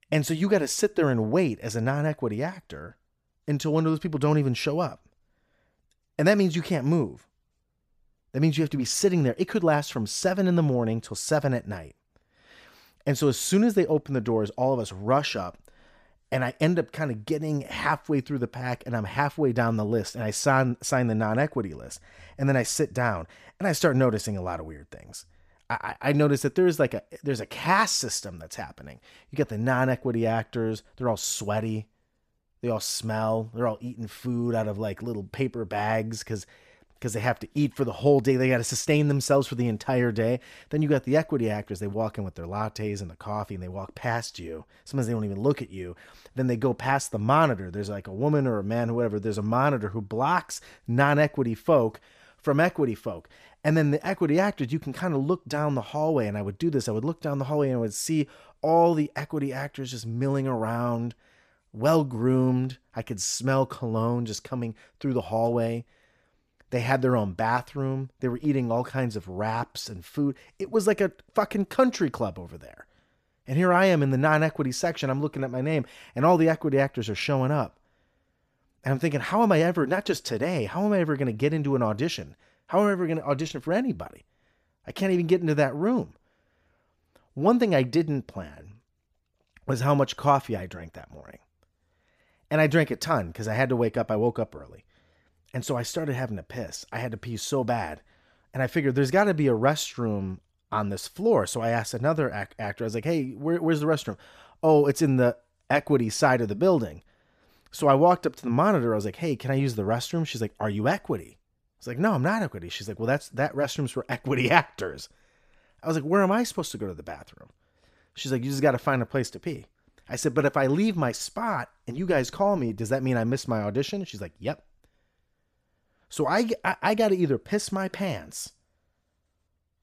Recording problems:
none

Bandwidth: 14.5 kHz